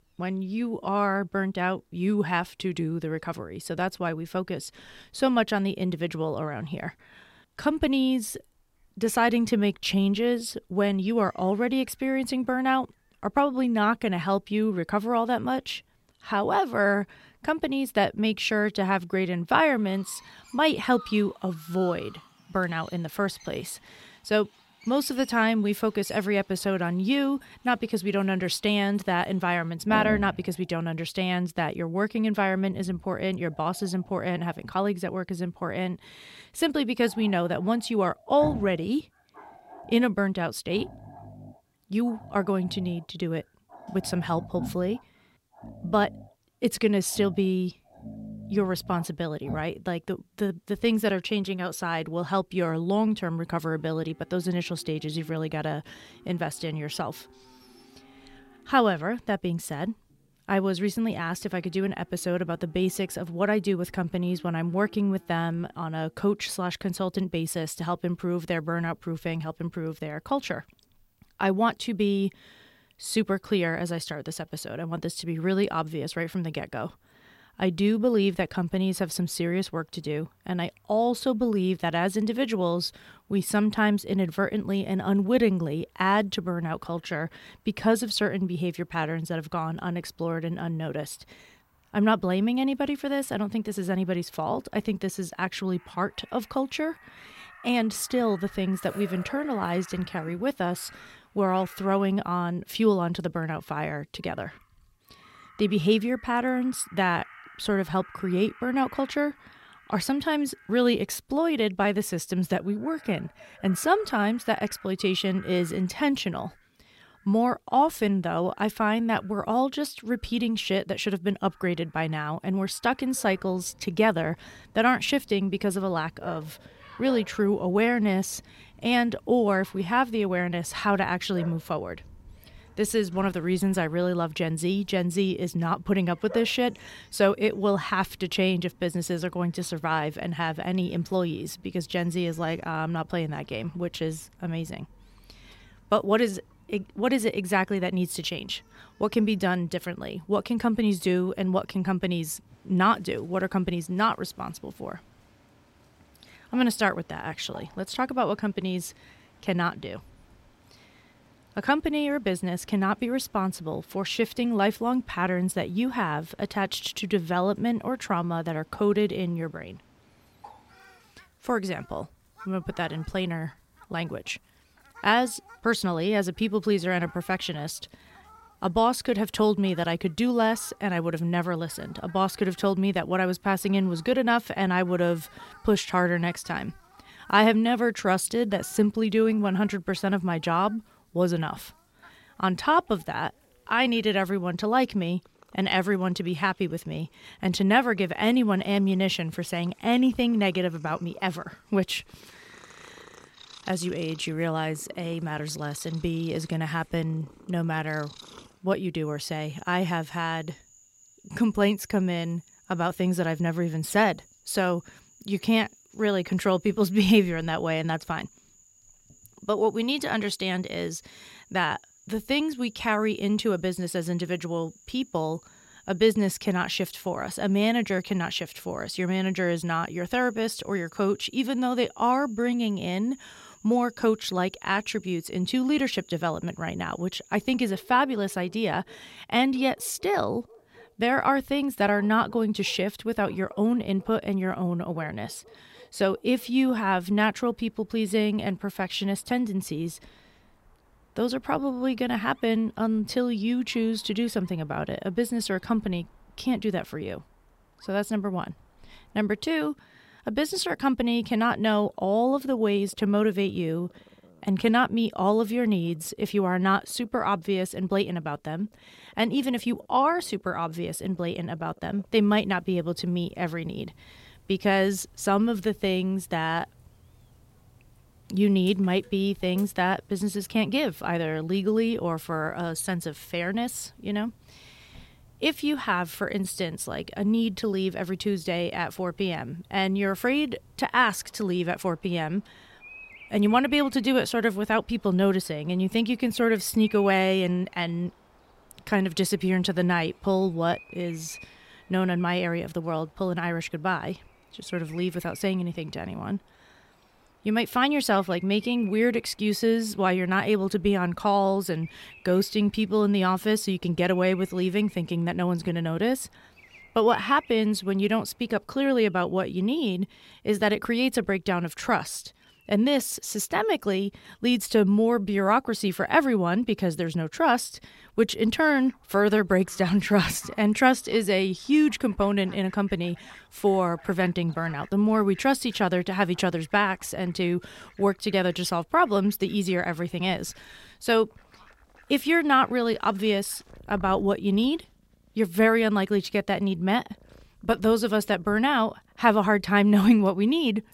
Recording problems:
animal sounds; faint; throughout; 25 dB below the speech

